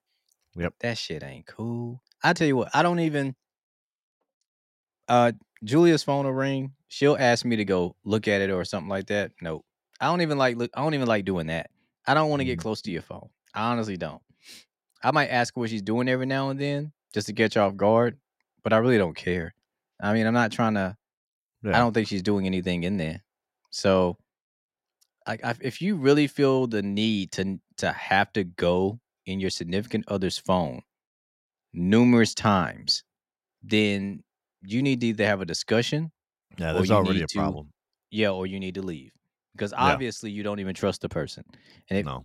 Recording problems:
none

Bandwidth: 16 kHz